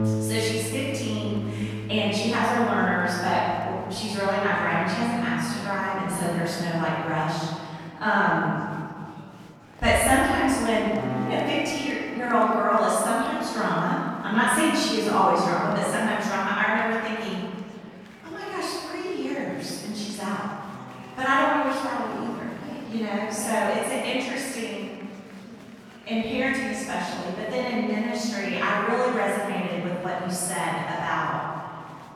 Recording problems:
room echo; strong; dies away in 2 s
off-mic speech; far
background music; noticeable; throughout; 10 dB below the speech
murmuring crowd; faint; throughout; 25 dB below the speech

